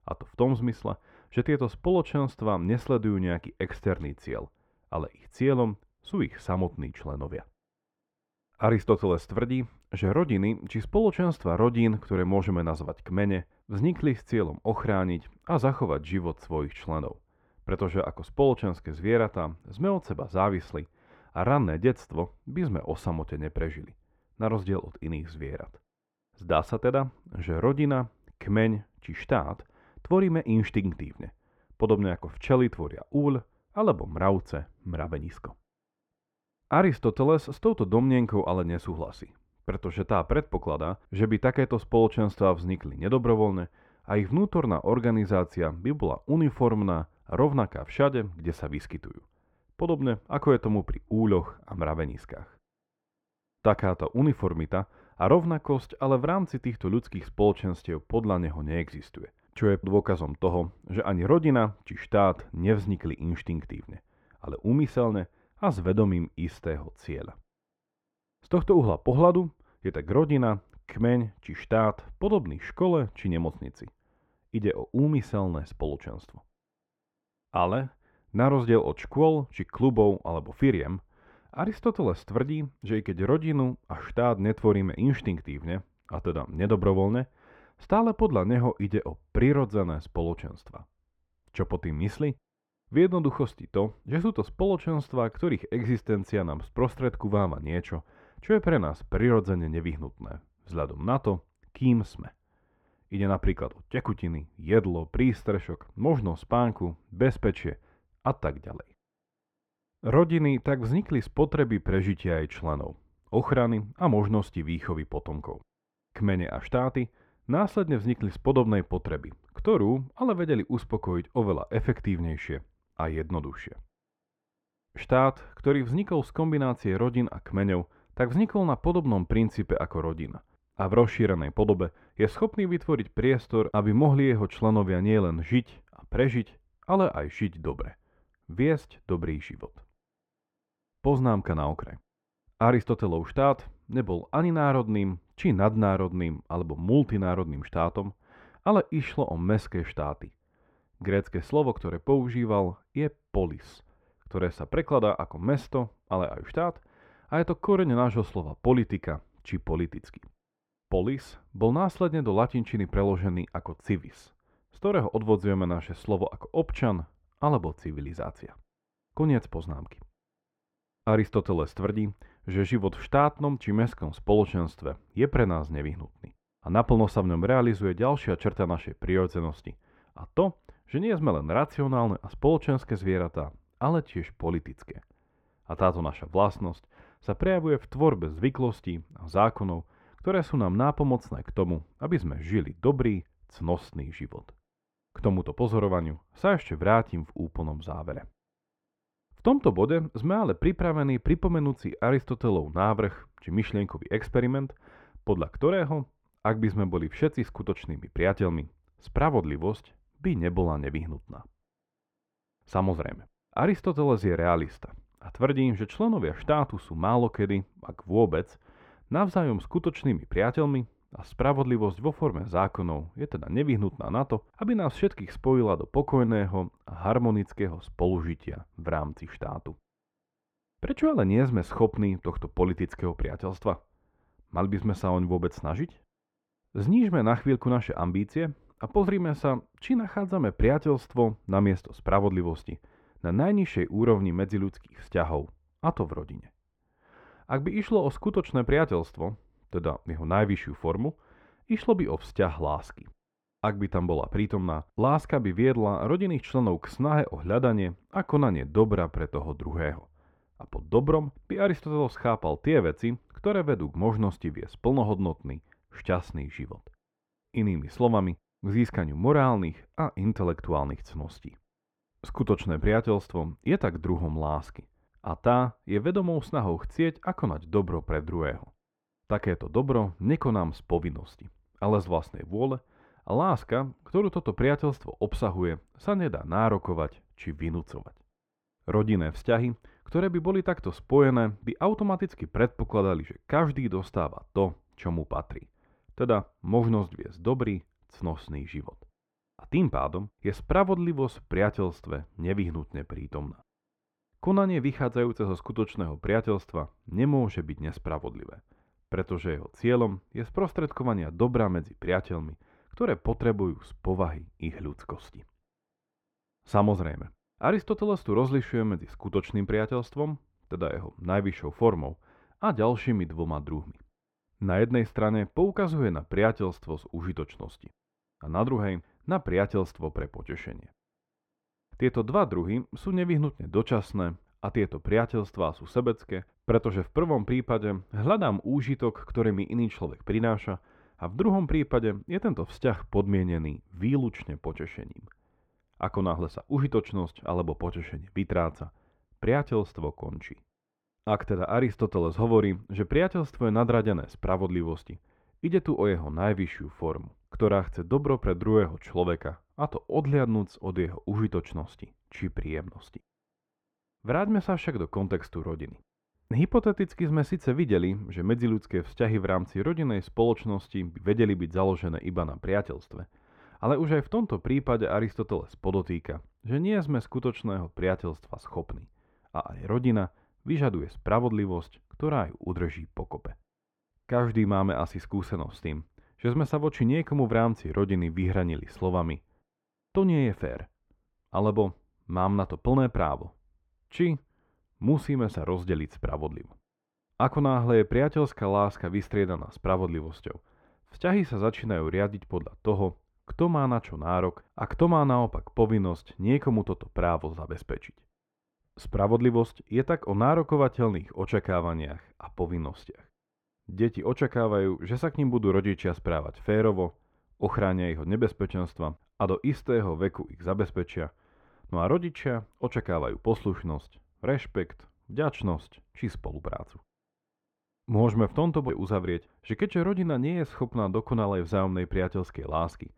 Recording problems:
muffled; very; fading above 4 kHz

